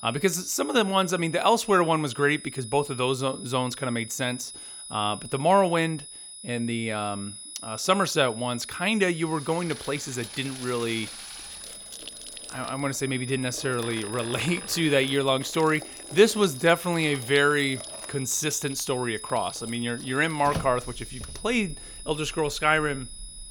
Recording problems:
high-pitched whine; noticeable; throughout; 10 kHz, 15 dB below the speech
household noises; noticeable; from 9.5 s on; 15 dB below the speech

